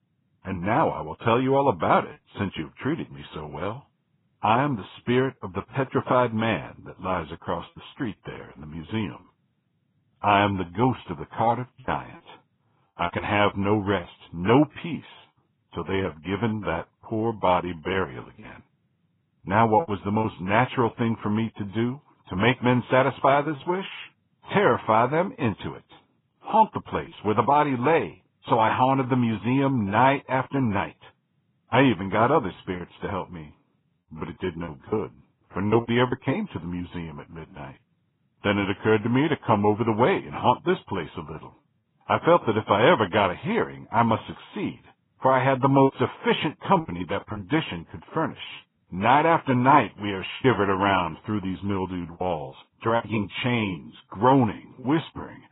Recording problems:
garbled, watery; badly; nothing above 3.5 kHz
choppy; occasionally; 3% of the speech affected

